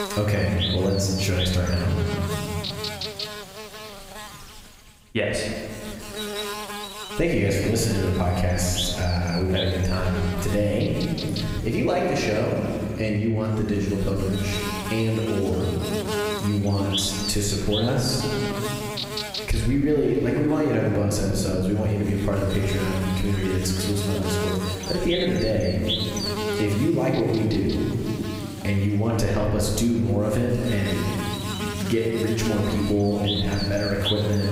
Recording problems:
room echo; noticeable; dies away in 1.6 s
off-mic speech; somewhat distant
squashed, flat; somewhat
electrical hum; loud; throughout; 50 Hz, 3 dB below the speech

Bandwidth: 15.5 kHz